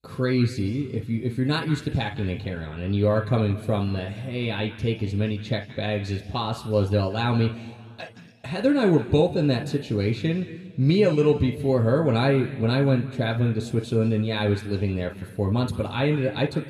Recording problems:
room echo; slight; dies away in 1.3 s
off-mic speech; somewhat distant

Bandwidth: 15 kHz